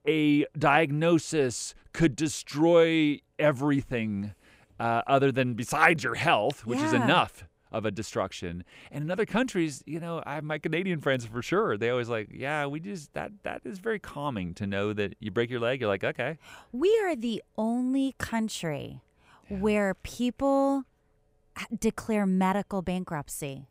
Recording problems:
none

